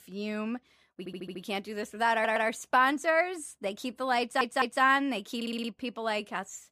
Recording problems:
audio stuttering; 4 times, first at 1 s

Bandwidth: 15 kHz